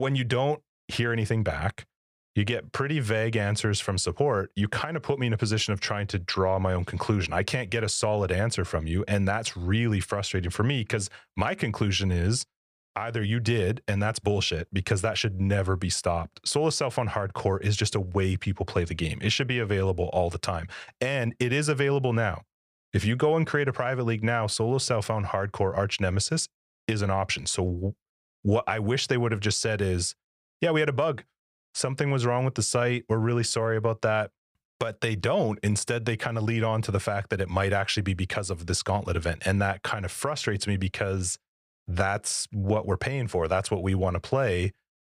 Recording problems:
abrupt cut into speech; at the start

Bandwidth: 15 kHz